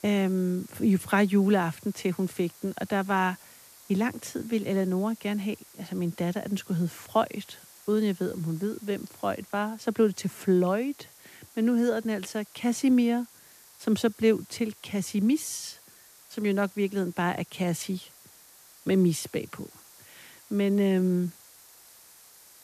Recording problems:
hiss; faint; throughout; 20 dB below the speech

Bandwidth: 14.5 kHz